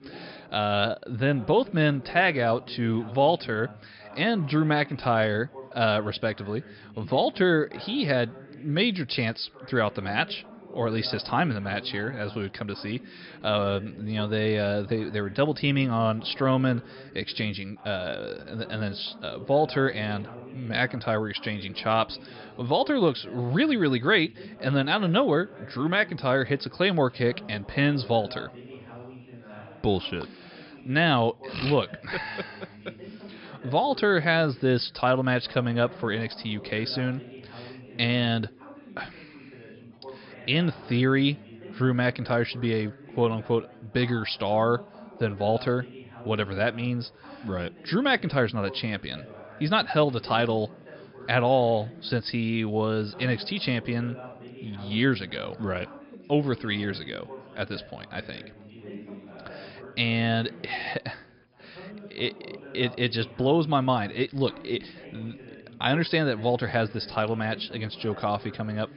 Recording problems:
high frequencies cut off; noticeable; nothing above 5.5 kHz
chatter from many people; noticeable; throughout; 20 dB below the speech

